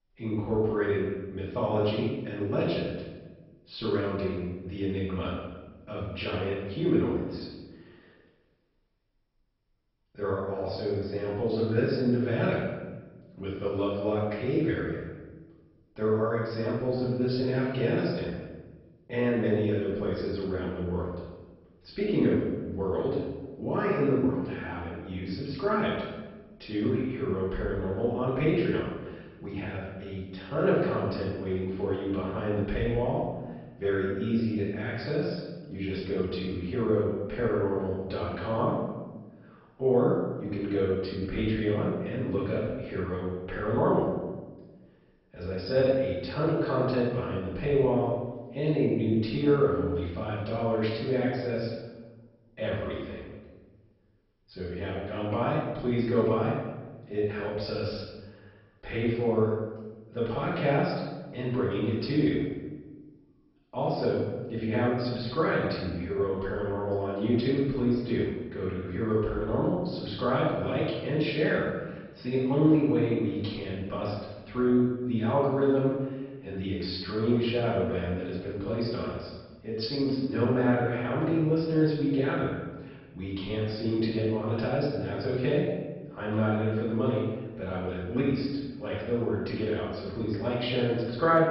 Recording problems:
off-mic speech; far
garbled, watery; badly; nothing above 5.5 kHz
room echo; noticeable; dies away in 1.1 s

